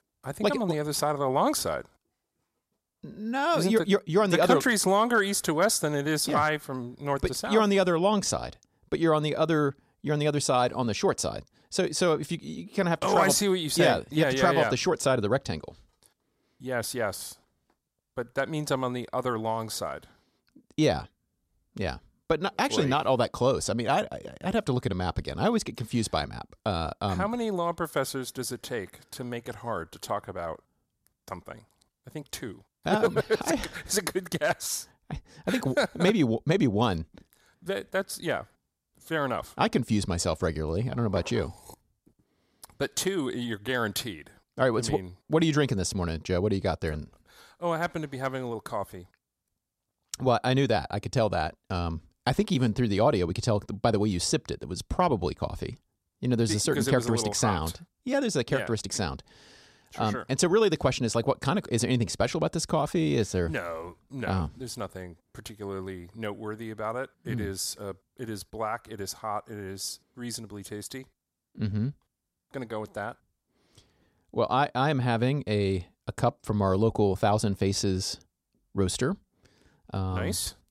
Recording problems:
none

